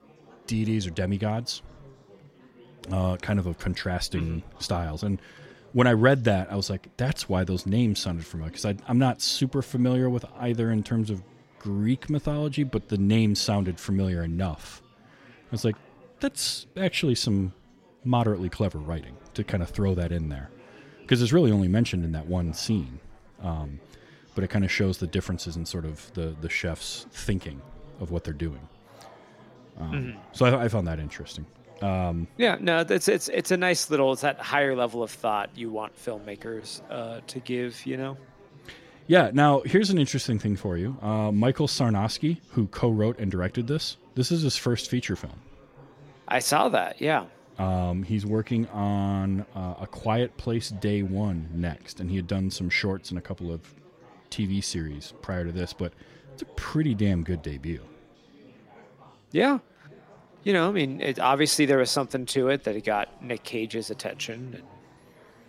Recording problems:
chatter from many people; faint; throughout; 25 dB below the speech

